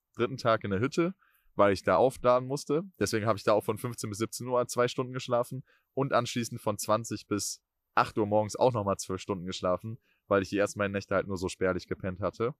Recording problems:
none

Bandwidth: 14.5 kHz